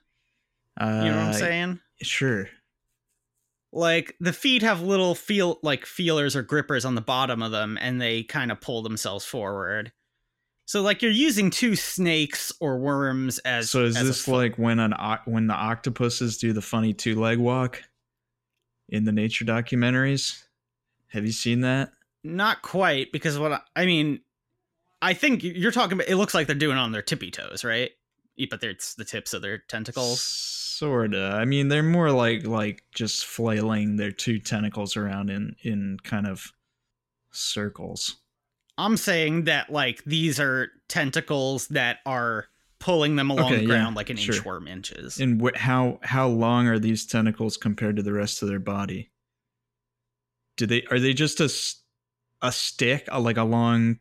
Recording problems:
none

